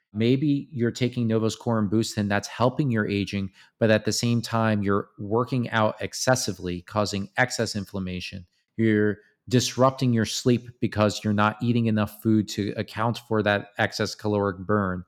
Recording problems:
none

